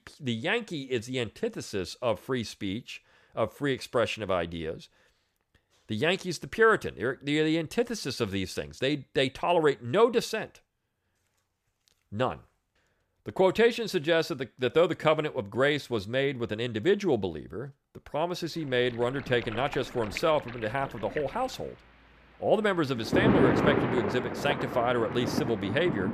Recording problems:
rain or running water; loud; from 19 s on; 2 dB below the speech

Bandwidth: 14.5 kHz